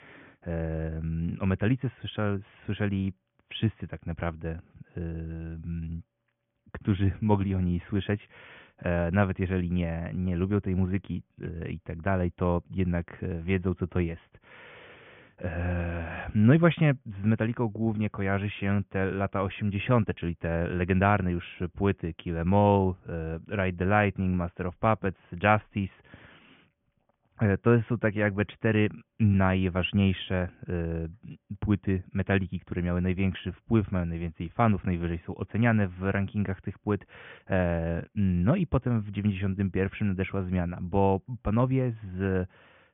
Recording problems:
high frequencies cut off; severe; nothing above 3.5 kHz

